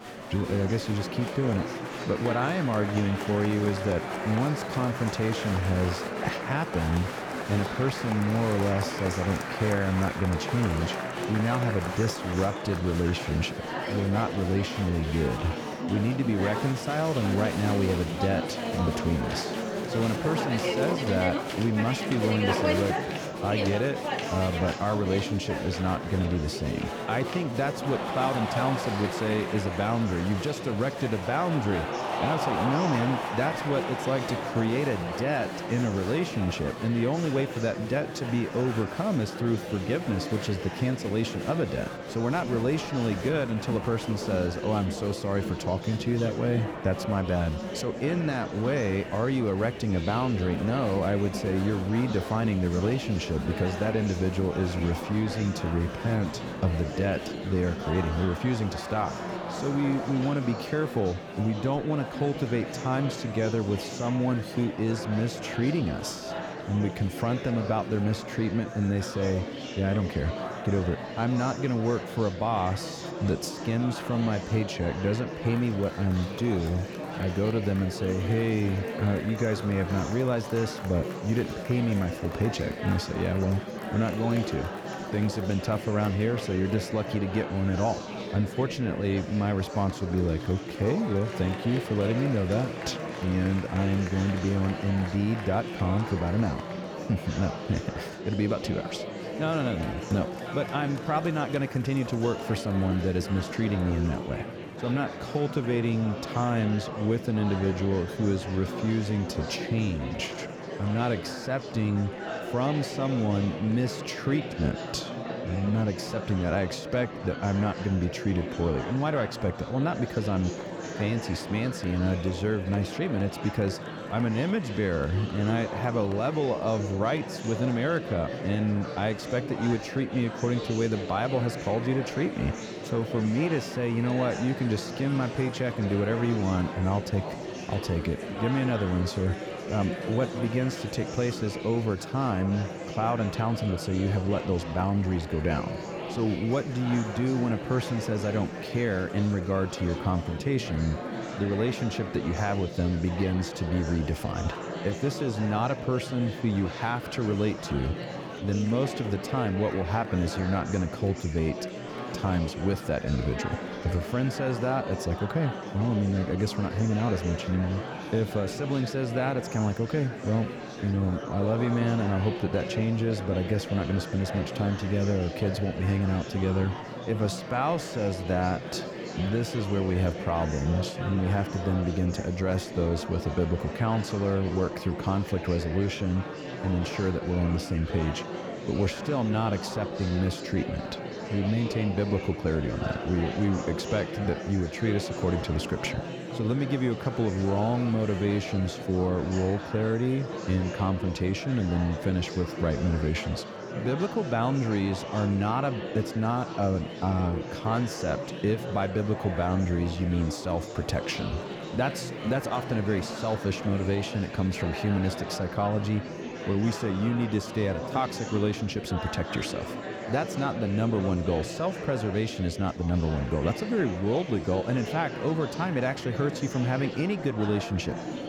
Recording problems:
murmuring crowd; loud; throughout; 6 dB below the speech

